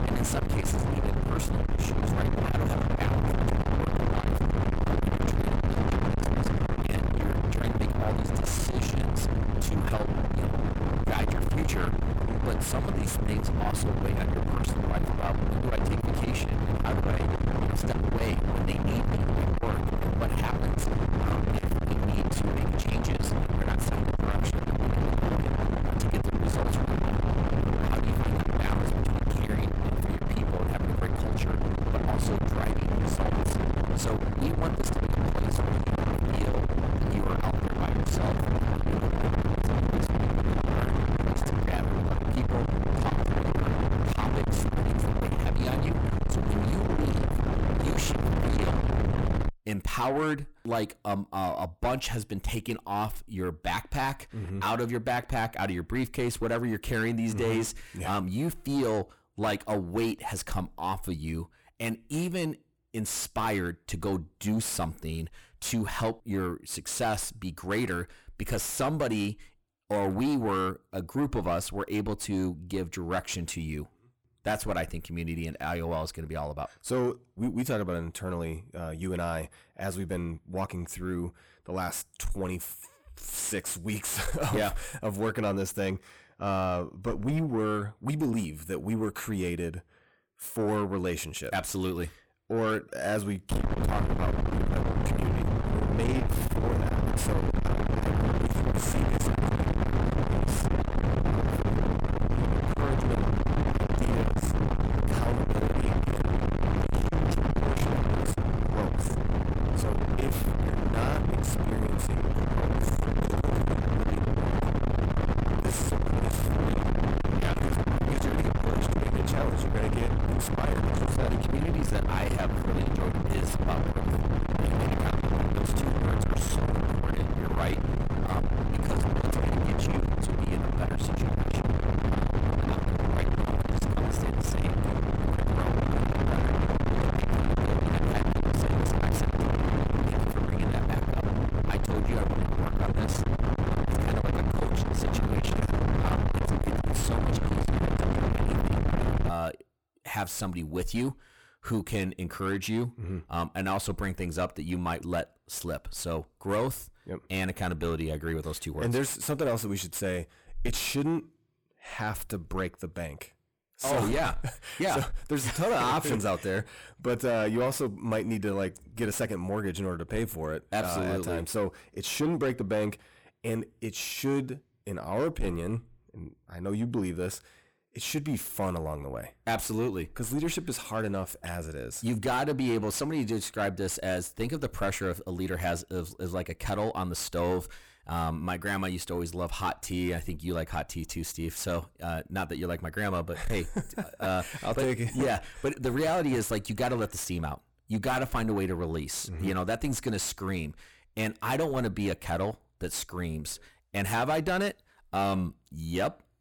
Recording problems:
distortion; heavy; 8 dB below the speech
wind noise on the microphone; heavy; until 49 s and from 1:34 to 2:29; as loud as the speech

